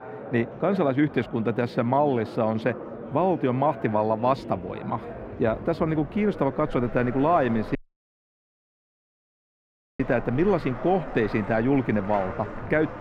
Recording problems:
muffled; very; fading above 3.5 kHz
household noises; noticeable; throughout; 20 dB below the speech
murmuring crowd; noticeable; throughout; 15 dB below the speech
audio cutting out; at 8 s for 2 s

